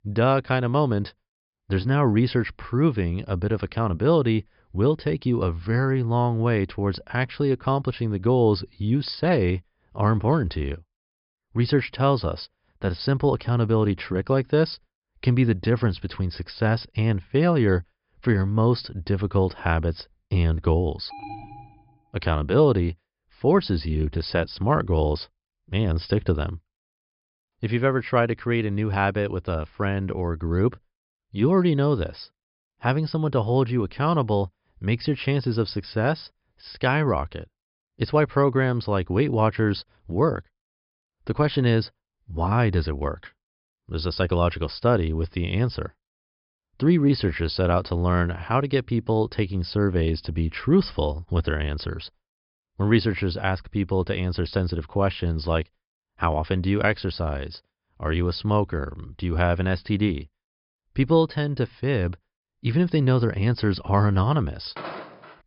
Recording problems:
high frequencies cut off; noticeable; nothing above 5.5 kHz
alarm; faint; at 21 s; peak 15 dB below the speech
footsteps; faint; at 1:05; peak 10 dB below the speech

